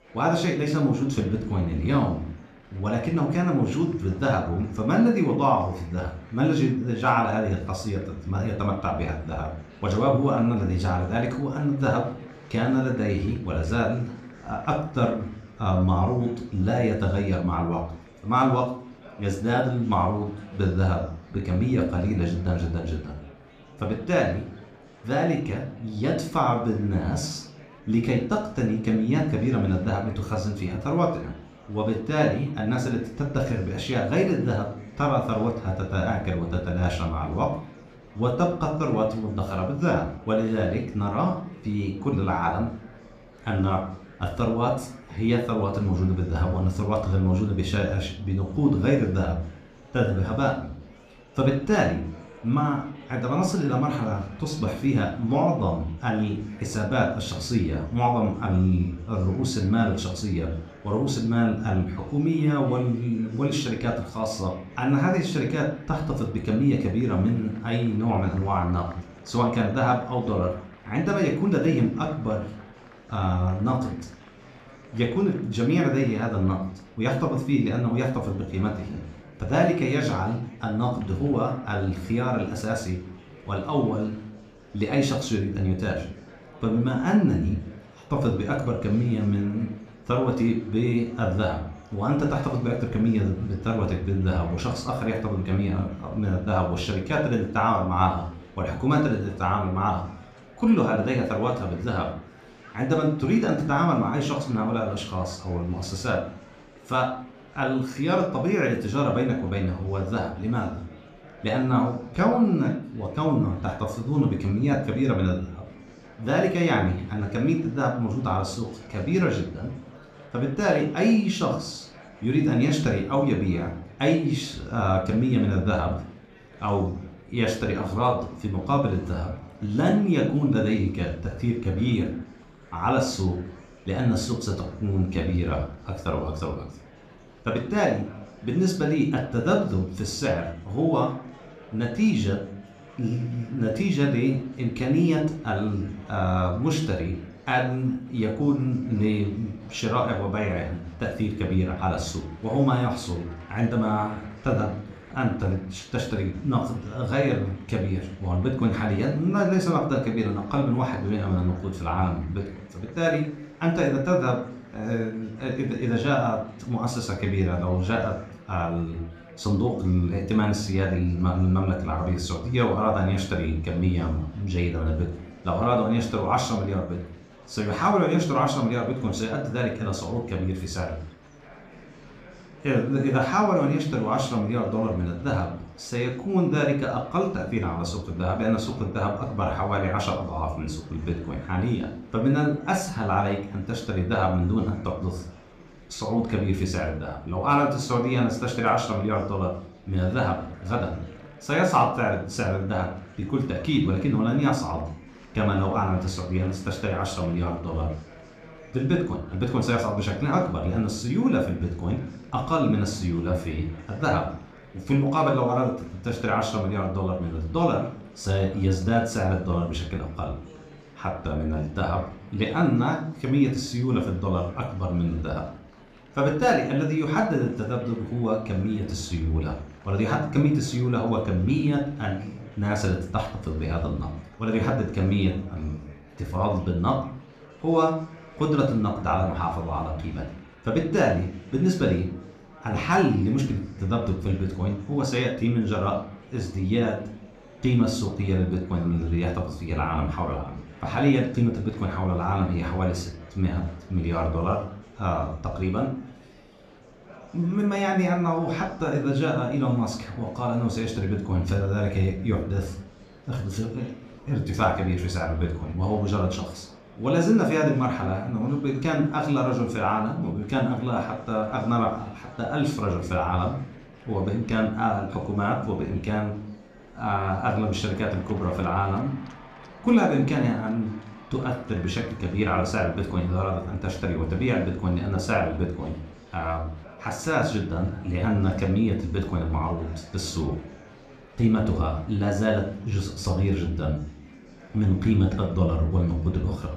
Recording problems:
room echo; slight; dies away in 0.4 s
off-mic speech; somewhat distant
murmuring crowd; faint; throughout; 20 dB below the speech

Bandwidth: 15 kHz